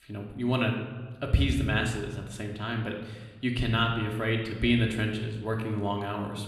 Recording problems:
room echo; slight; dies away in 1 s
off-mic speech; somewhat distant

